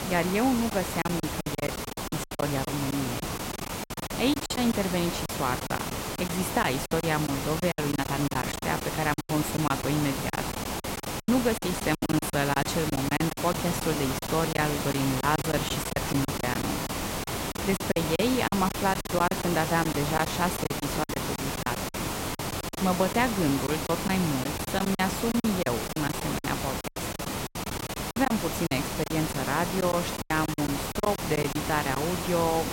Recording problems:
hiss; loud; throughout; 3 dB below the speech
choppy; very; 12% of the speech affected

